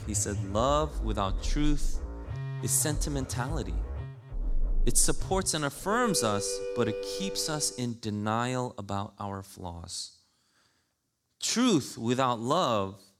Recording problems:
background music; loud; until 7.5 s; 7 dB below the speech

